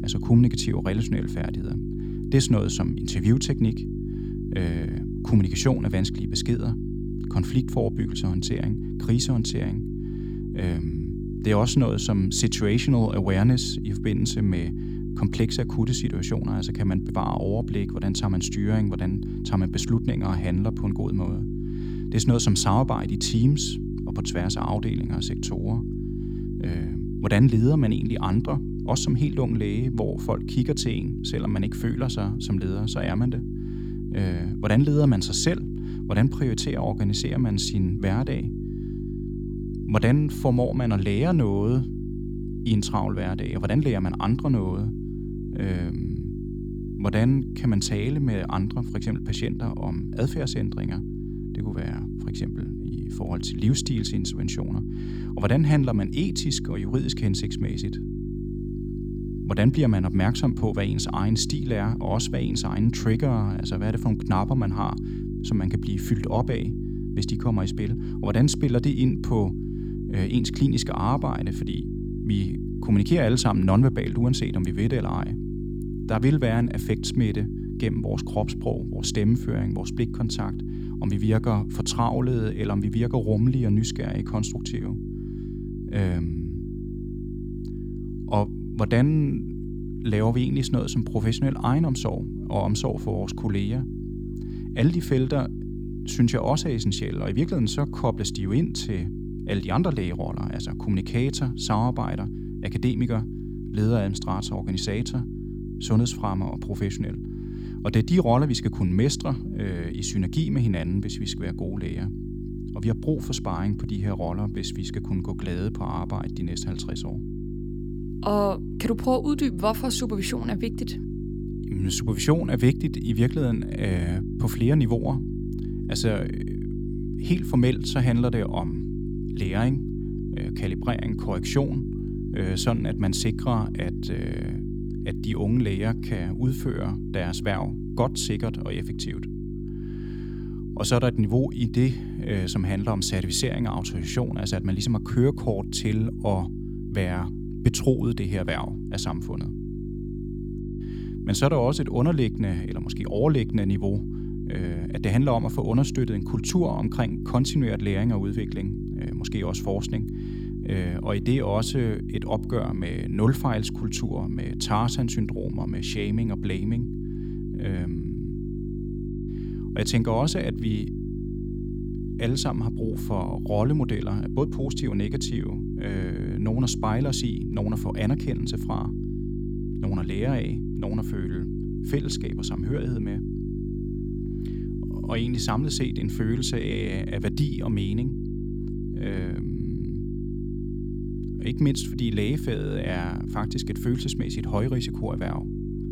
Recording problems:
electrical hum; loud; throughout; 50 Hz, 8 dB below the speech

